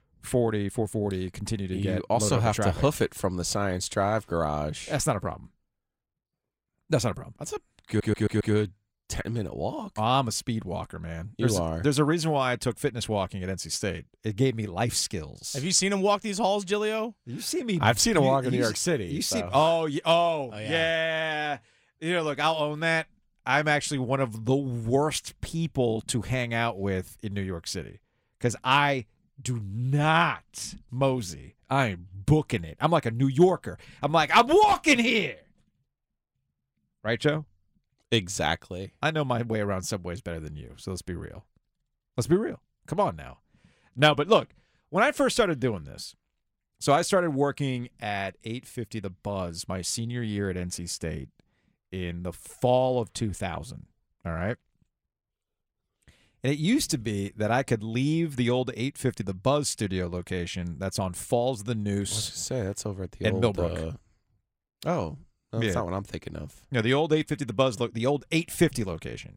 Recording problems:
audio stuttering; at 8 s

